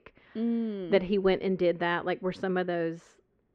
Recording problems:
muffled; very; fading above 1.5 kHz

